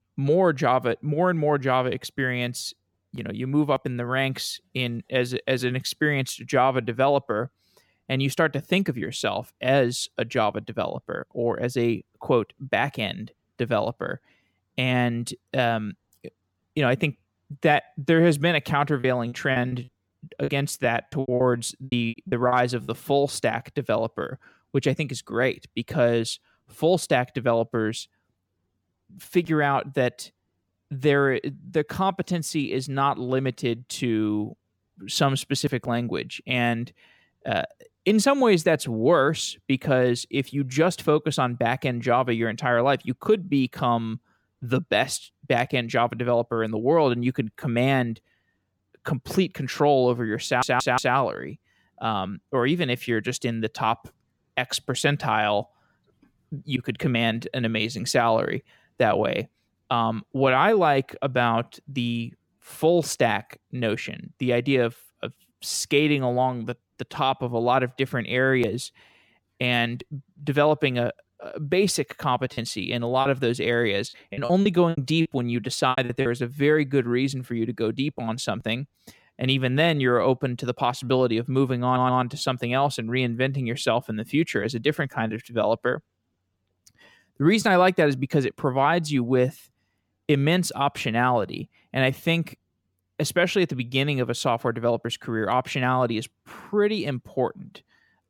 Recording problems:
choppy; very; from 19 to 23 s and from 1:13 to 1:16; 14% of the speech affected
audio stuttering; at 50 s and at 1:22

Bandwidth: 17 kHz